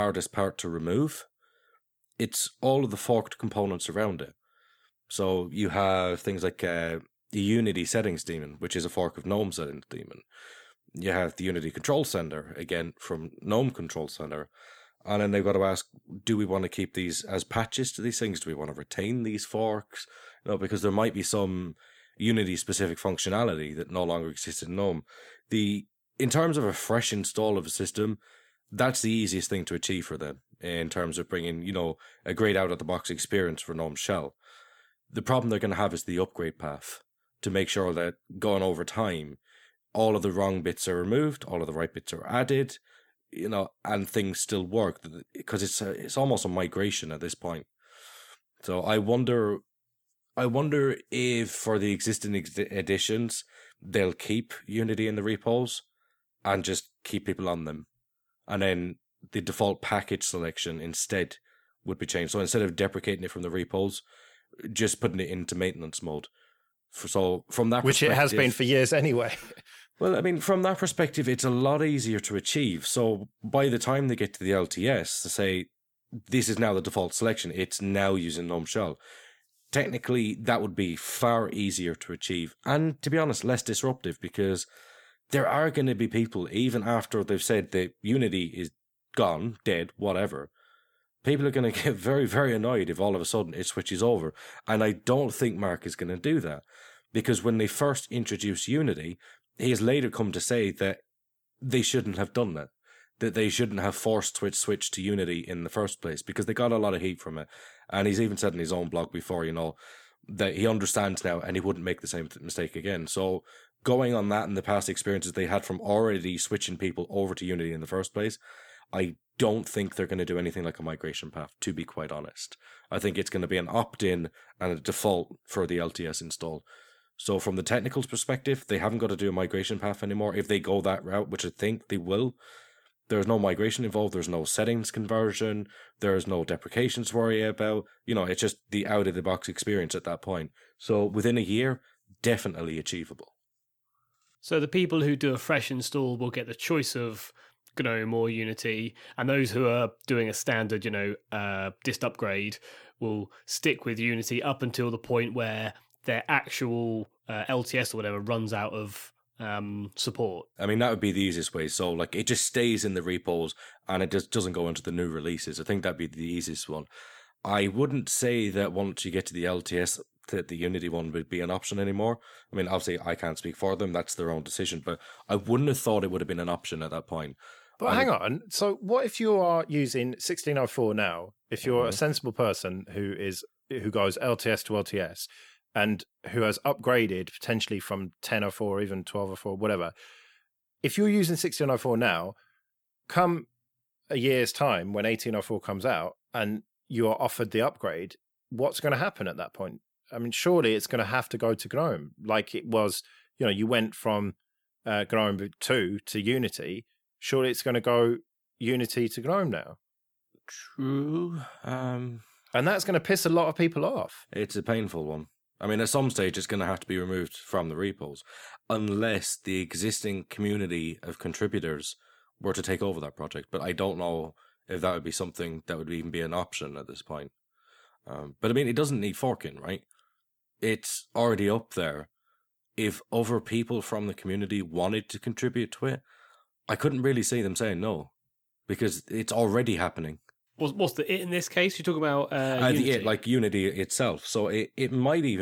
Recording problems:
abrupt cut into speech; at the start and the end

